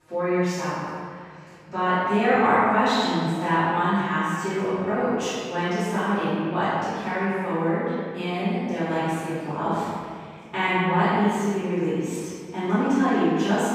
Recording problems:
room echo; strong; dies away in 1.8 s
off-mic speech; far

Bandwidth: 15 kHz